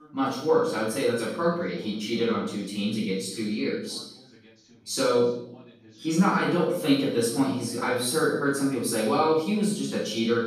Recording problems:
off-mic speech; far
room echo; noticeable; dies away in 0.7 s
background chatter; faint; throughout; 2 voices, 25 dB below the speech

